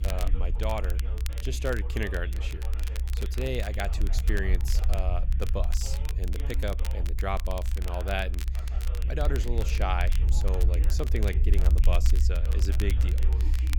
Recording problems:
voice in the background; noticeable; throughout; 15 dB below the speech
low rumble; noticeable; throughout; 15 dB below the speech
crackle, like an old record; noticeable; 10 dB below the speech

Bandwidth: 18 kHz